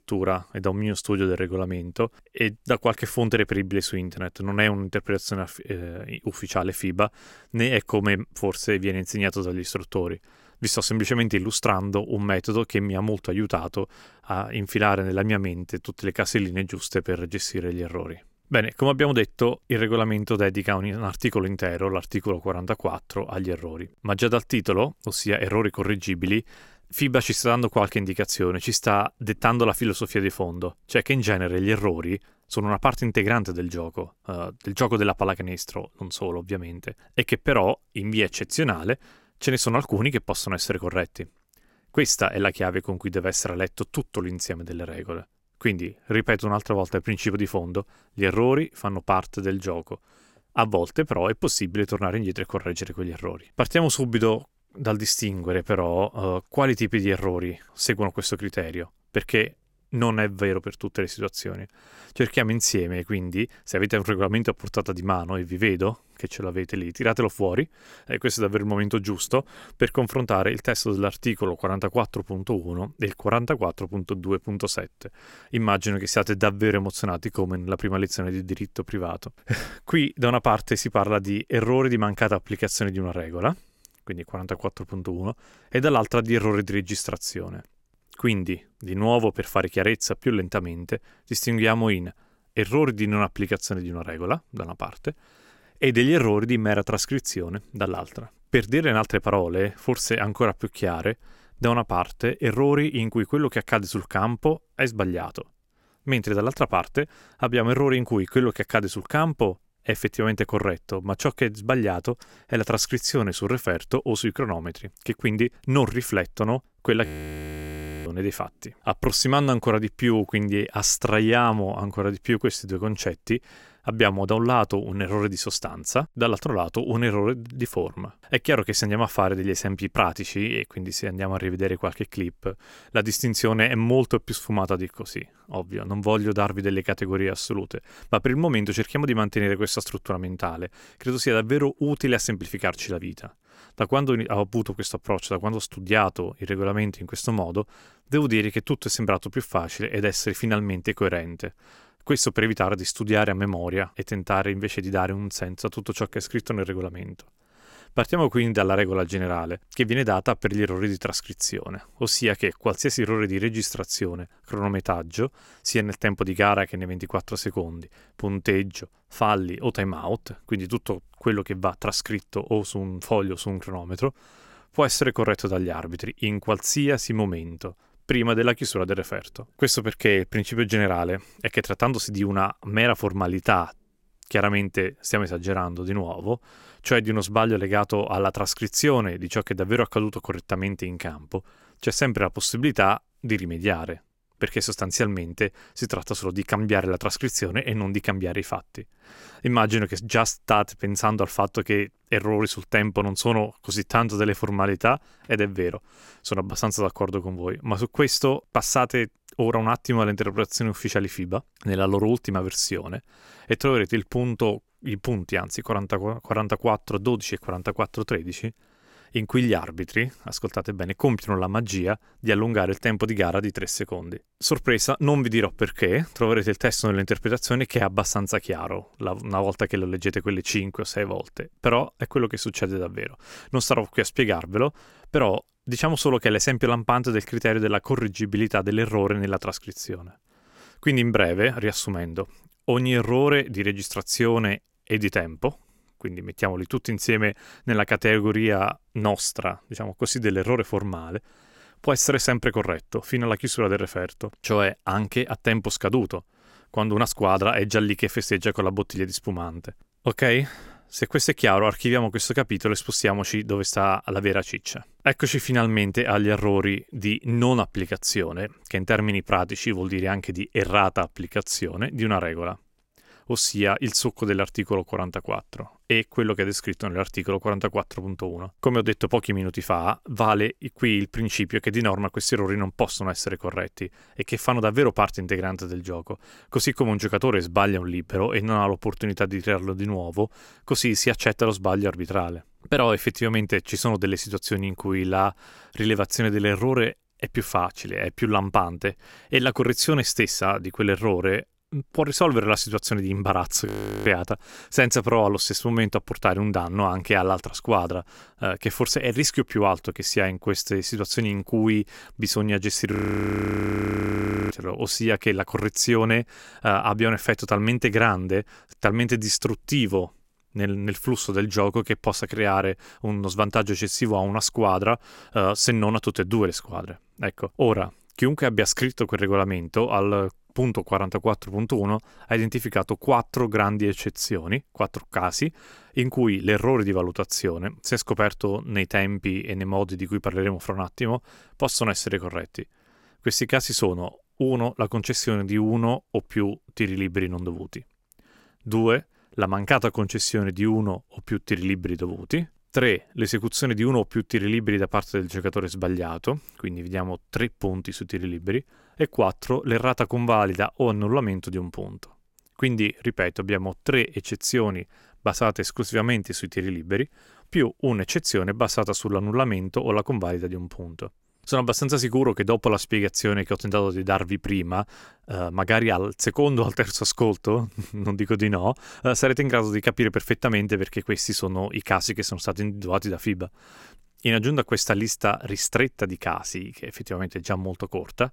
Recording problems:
audio freezing; at 1:57 for 1 s, at 5:04 and at 5:13 for 1.5 s

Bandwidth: 16.5 kHz